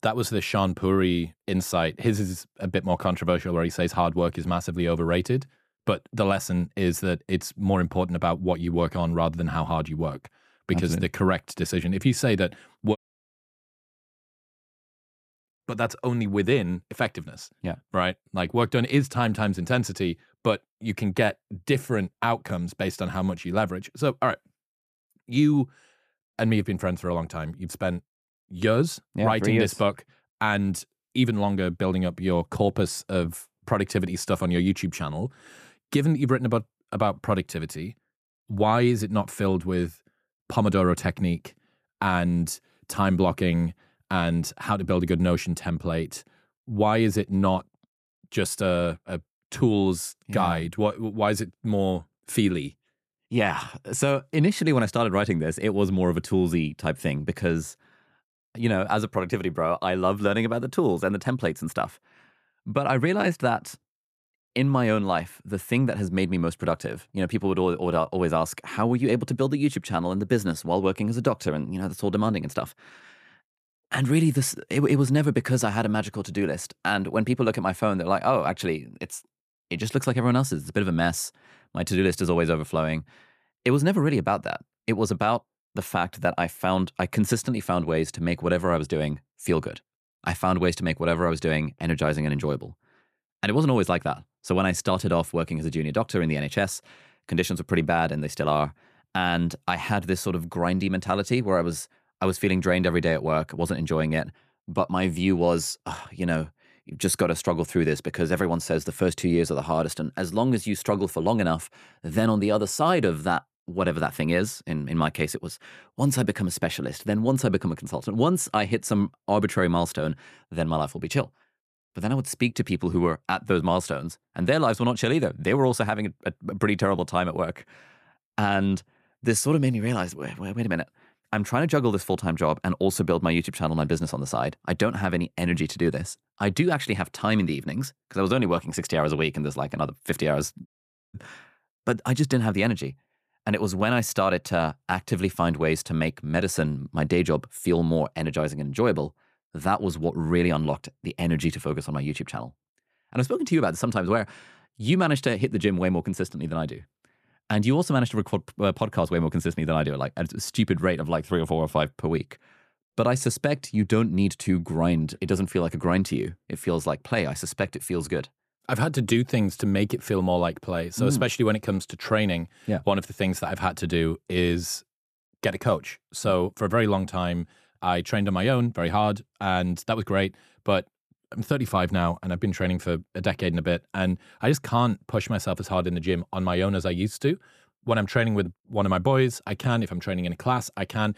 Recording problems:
audio cutting out; at 13 s for 2.5 s and at 2:21

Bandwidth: 14.5 kHz